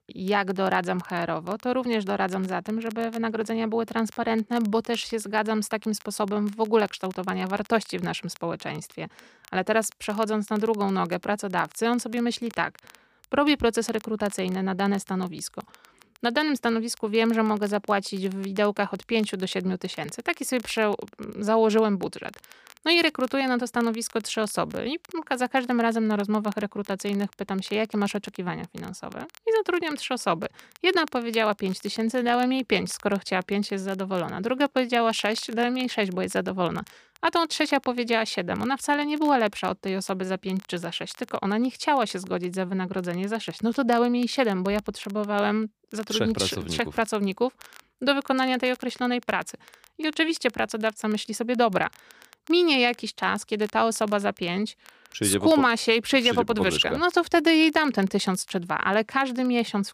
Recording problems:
crackle, like an old record; faint; 25 dB below the speech

